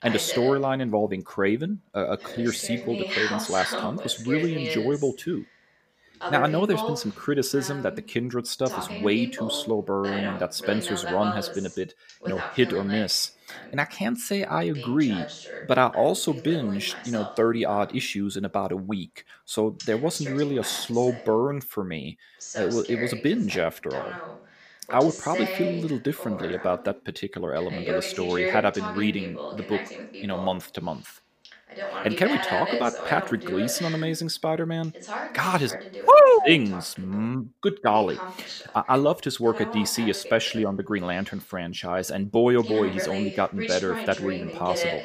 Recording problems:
voice in the background; loud; throughout; 8 dB below the speech

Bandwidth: 15 kHz